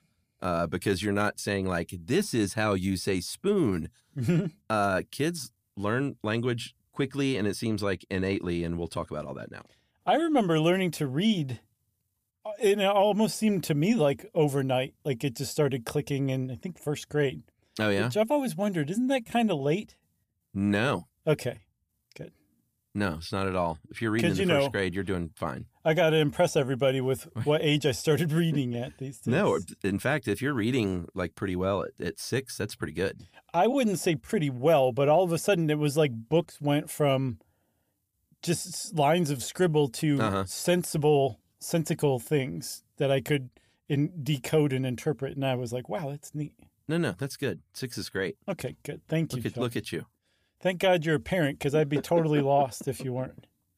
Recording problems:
none

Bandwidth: 15 kHz